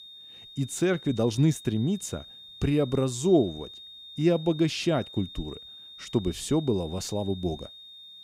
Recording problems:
high-pitched whine; noticeable; throughout; 3.5 kHz, 15 dB below the speech

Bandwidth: 15.5 kHz